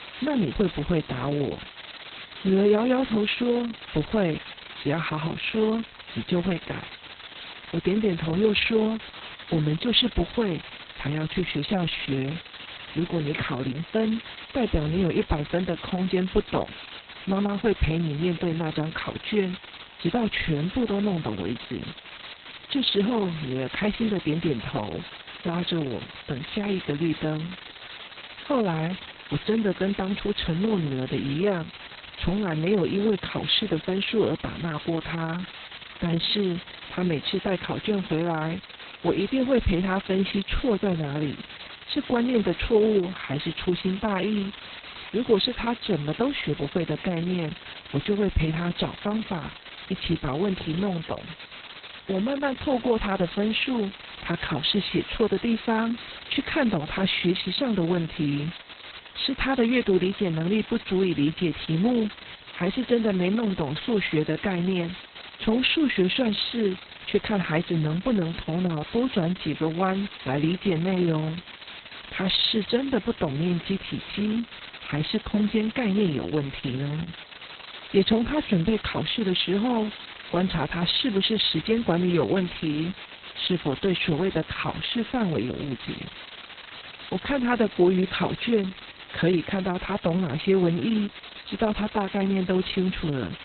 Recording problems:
garbled, watery; badly; nothing above 4 kHz
hiss; noticeable; throughout; 15 dB below the speech
crackling; faint; from 34 to 36 s and from 1:10 to 1:12; 25 dB below the speech

